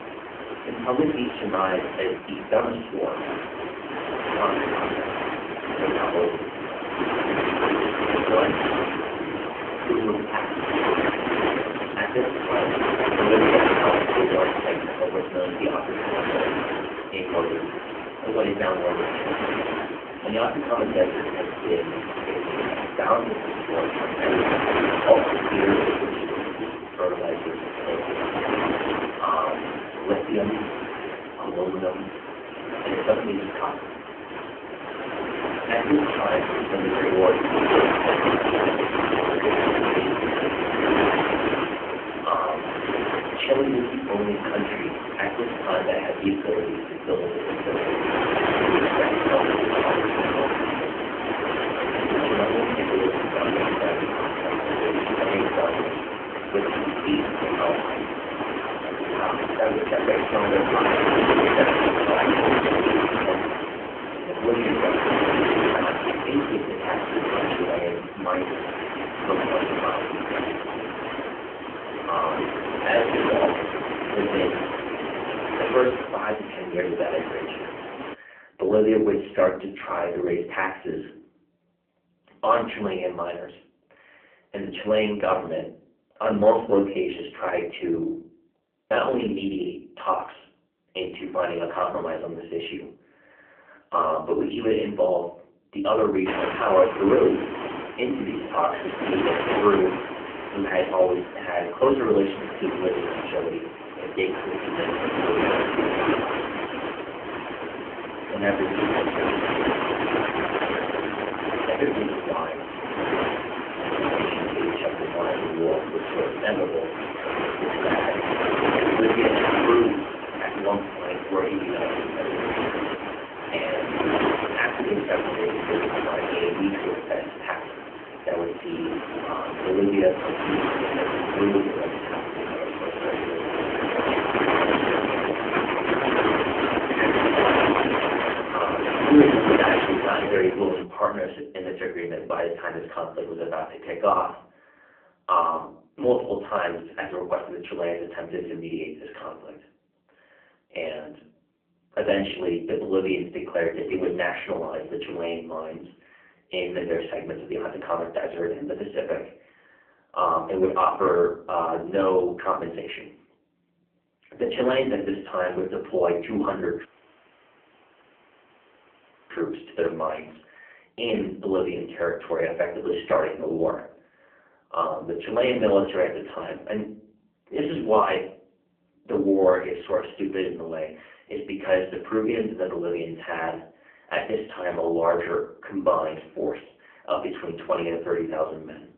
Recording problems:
phone-call audio; poor line
off-mic speech; far
room echo; slight; dies away in 0.4 s
wind noise on the microphone; heavy; until 1:18 and from 1:36 to 2:21; 1 dB above the speech
audio cutting out; at 2:47 for 2.5 s

